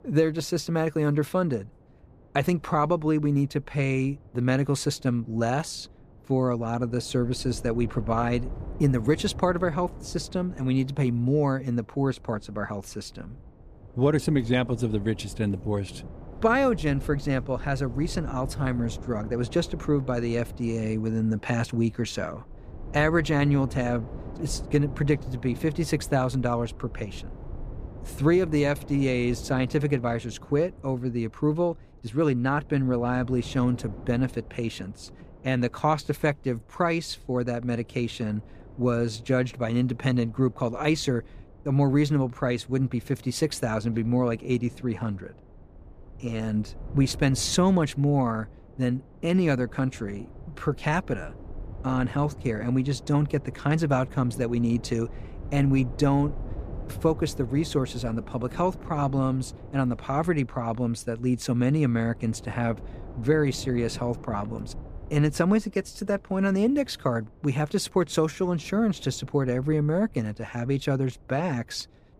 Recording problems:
wind noise on the microphone; occasional gusts; 20 dB below the speech

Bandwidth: 15 kHz